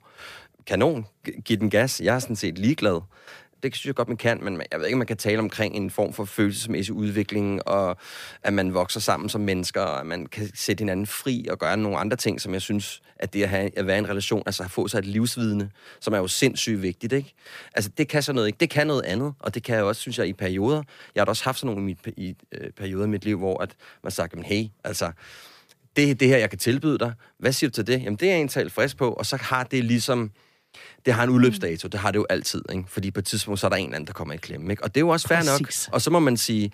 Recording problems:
none

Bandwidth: 15 kHz